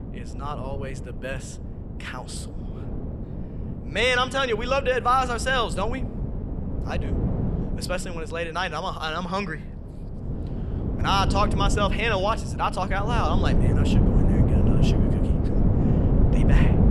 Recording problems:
wind noise on the microphone; heavy; 9 dB below the speech

